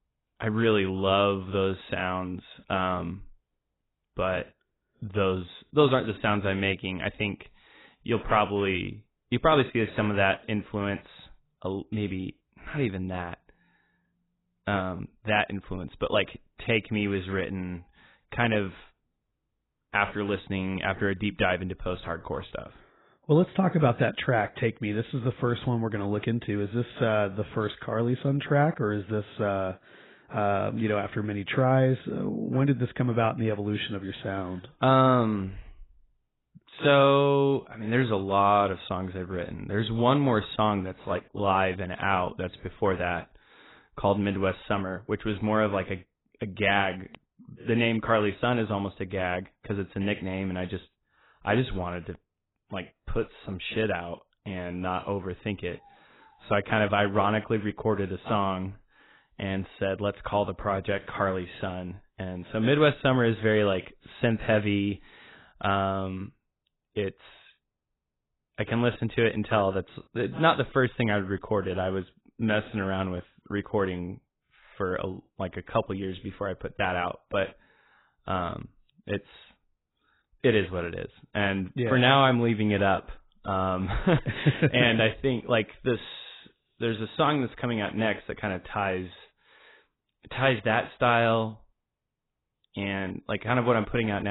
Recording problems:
garbled, watery; badly; nothing above 4 kHz
abrupt cut into speech; at the end

